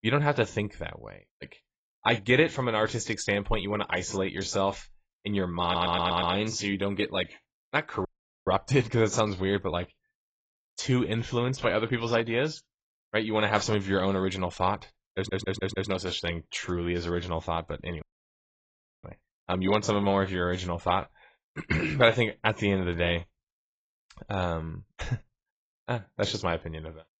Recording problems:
garbled, watery; badly; nothing above 7.5 kHz
audio stuttering; at 5.5 s and at 15 s
audio cutting out; at 8 s and at 18 s for 1 s

